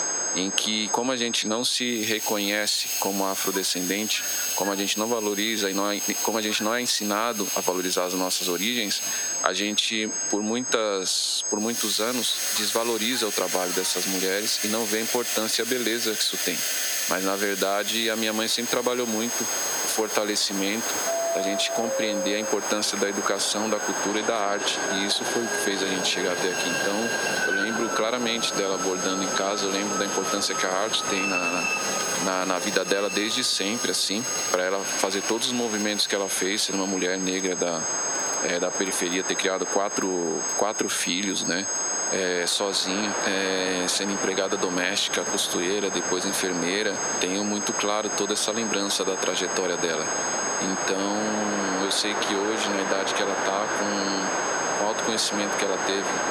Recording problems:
thin; very slightly; fading below 350 Hz
squashed, flat; somewhat
high-pitched whine; loud; throughout; 6.5 kHz, 4 dB below the speech
household noises; loud; throughout; 5 dB below the speech
train or aircraft noise; loud; throughout; 5 dB below the speech

